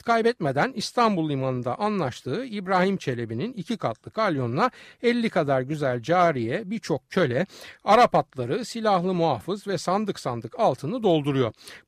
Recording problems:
none

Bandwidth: 15 kHz